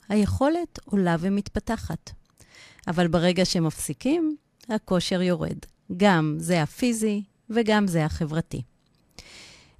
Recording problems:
none

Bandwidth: 14.5 kHz